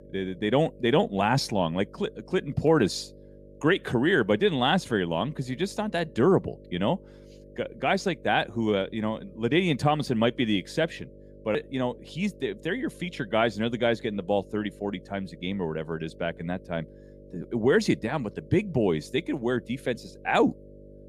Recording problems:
electrical hum; faint; throughout; 50 Hz, 25 dB below the speech

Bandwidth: 15 kHz